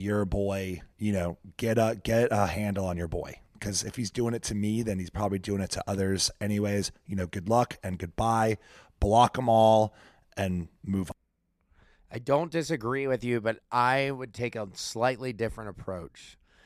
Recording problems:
abrupt cut into speech; at the start

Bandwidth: 14 kHz